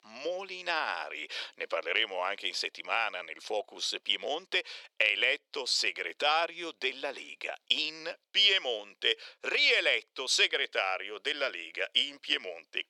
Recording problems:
thin; very; fading below 450 Hz

